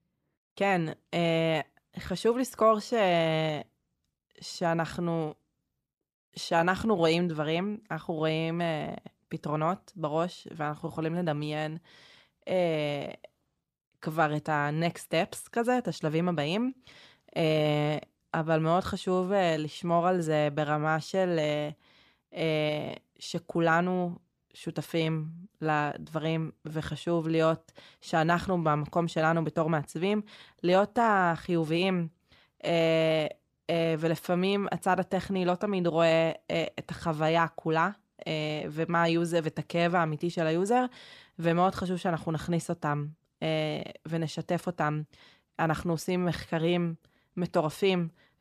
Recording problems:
none

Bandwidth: 14.5 kHz